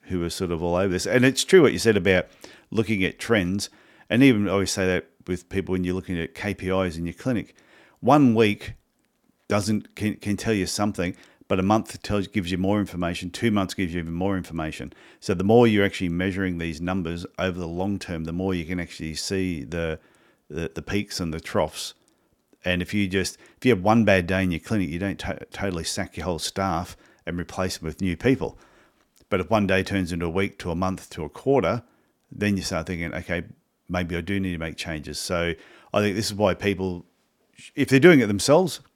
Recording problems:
none

